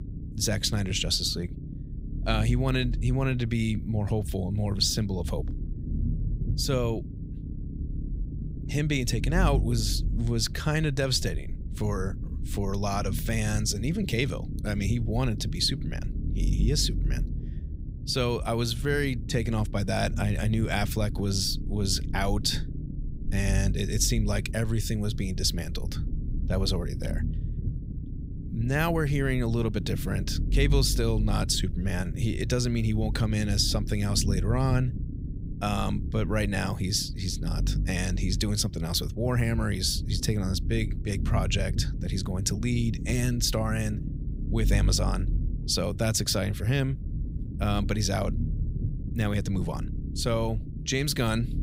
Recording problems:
low rumble; noticeable; throughout; 15 dB below the speech

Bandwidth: 15.5 kHz